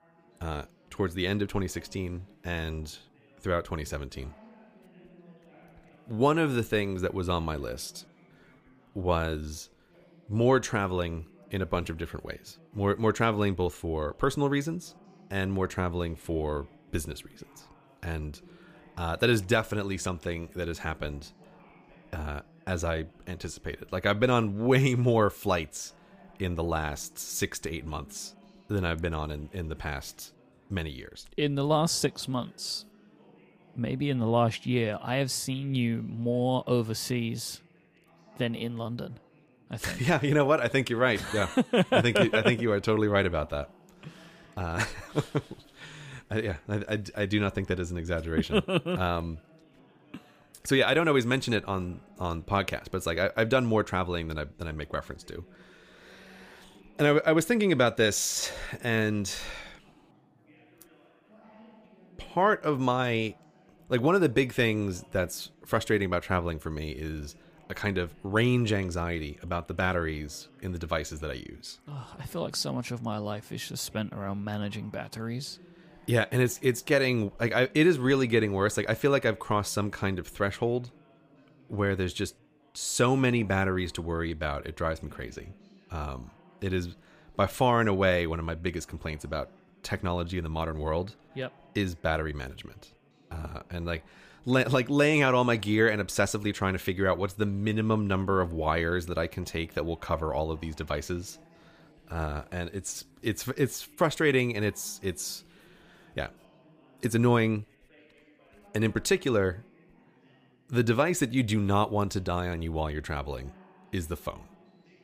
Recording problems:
background chatter; faint; throughout; 4 voices, 30 dB below the speech

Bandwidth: 15 kHz